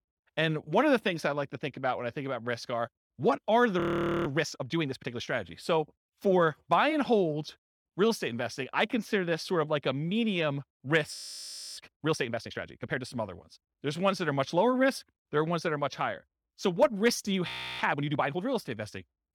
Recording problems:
audio freezing; at 4 s, at 11 s for 0.5 s and at 17 s

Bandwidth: 18 kHz